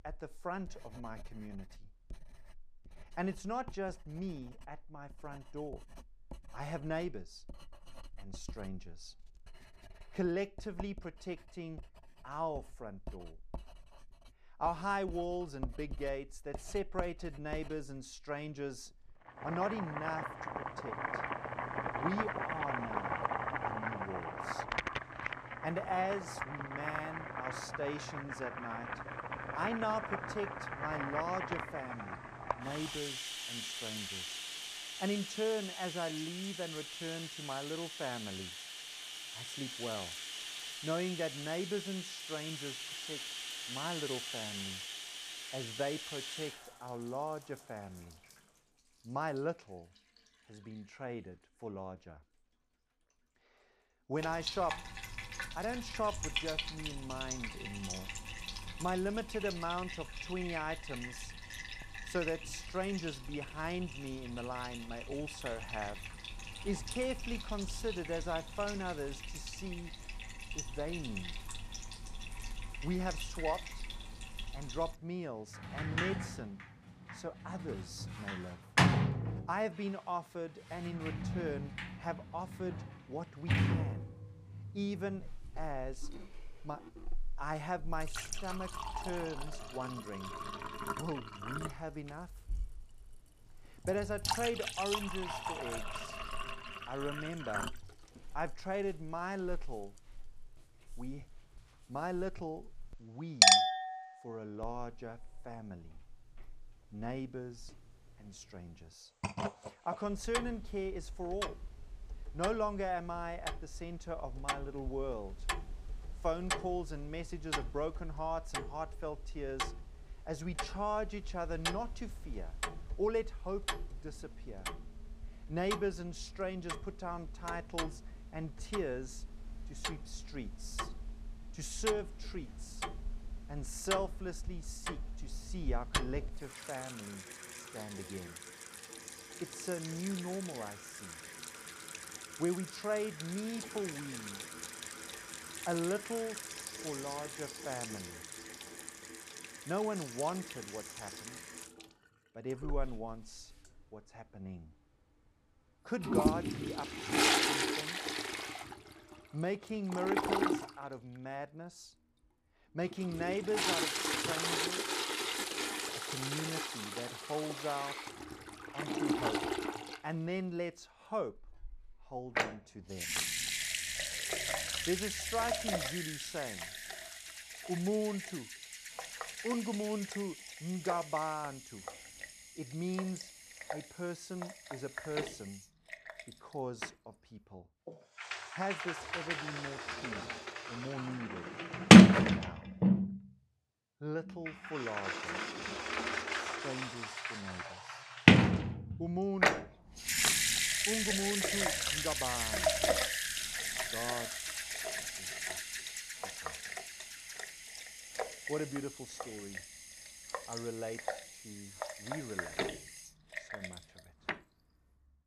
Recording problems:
household noises; very loud; throughout; 5 dB above the speech

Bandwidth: 15 kHz